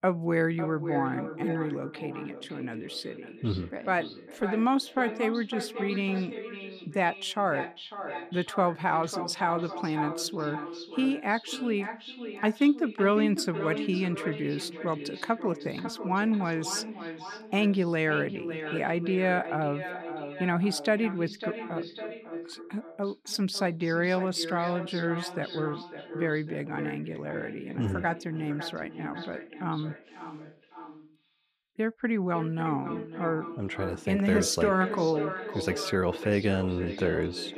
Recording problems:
echo of what is said; strong; throughout; 550 ms later, 9 dB below the speech

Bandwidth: 14.5 kHz